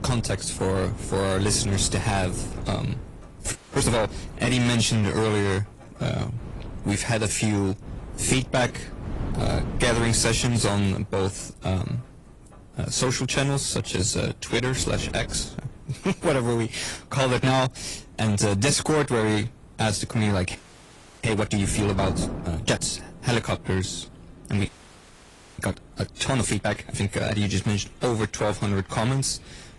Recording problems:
distortion; slight; 6% of the sound clipped
garbled, watery; slightly; nothing above 10.5 kHz
wind noise on the microphone; occasional gusts; 20 dB below the speech
rain or running water; faint; throughout; 20 dB below the speech
audio freezing; at 3.5 s, at 21 s for 0.5 s and at 25 s for 1 s

